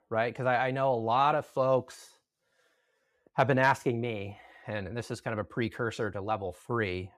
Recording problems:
none

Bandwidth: 15 kHz